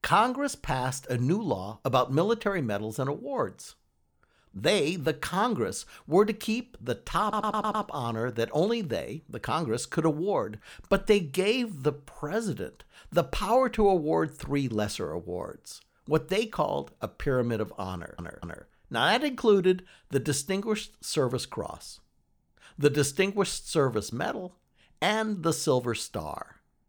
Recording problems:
audio stuttering; at 7 s and at 18 s

